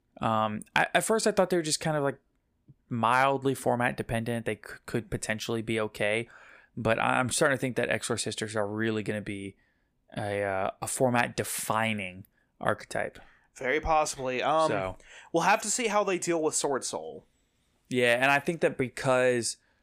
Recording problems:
none

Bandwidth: 15 kHz